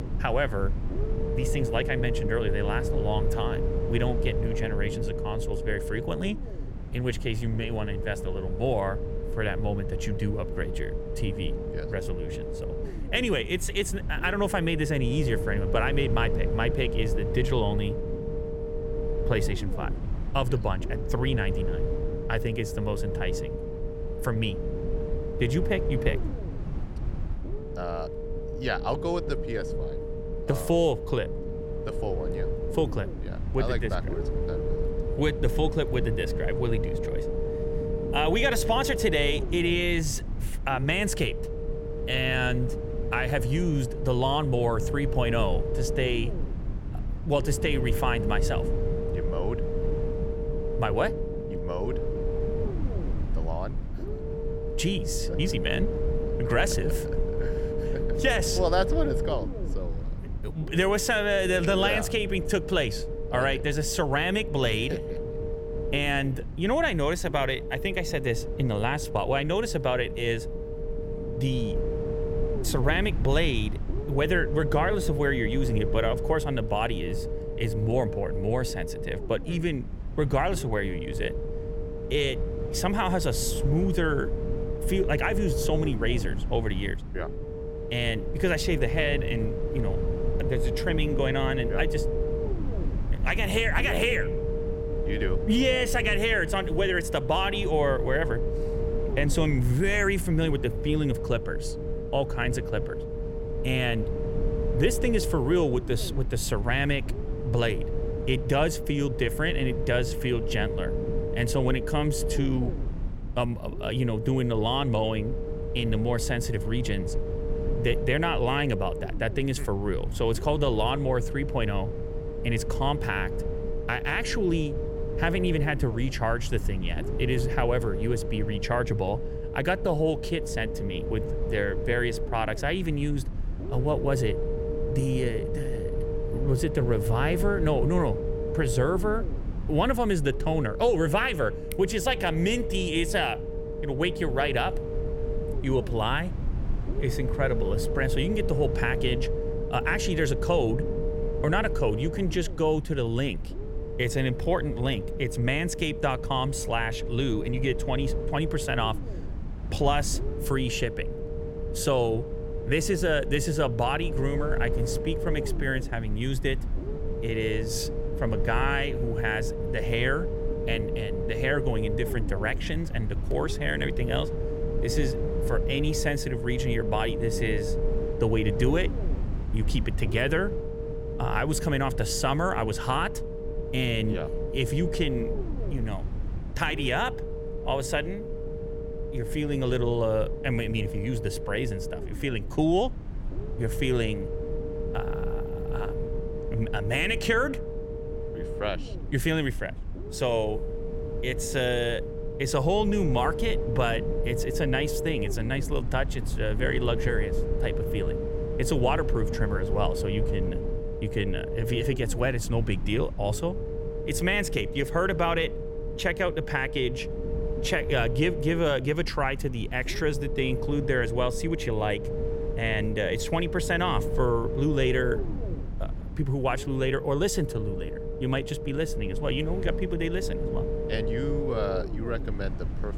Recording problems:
low rumble; loud; throughout; 7 dB below the speech

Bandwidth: 16.5 kHz